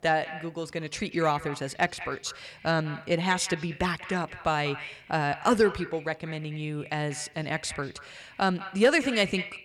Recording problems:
echo of what is said; noticeable; throughout; 190 ms later, 15 dB below the speech

